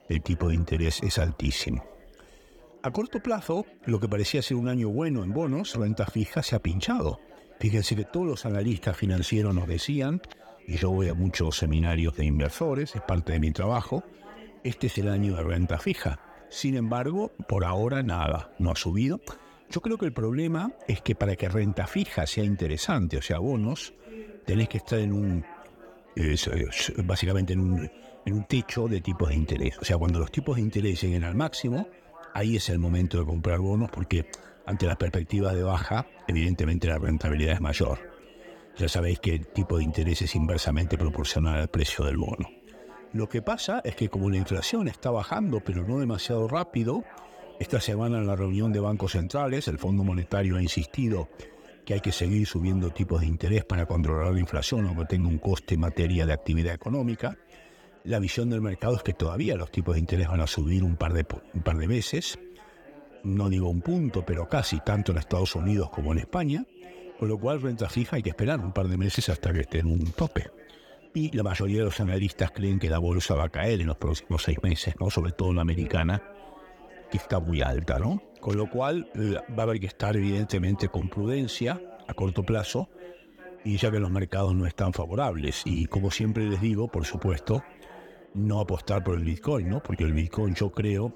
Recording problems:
chatter from many people; faint; throughout; 20 dB below the speech

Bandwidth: 18 kHz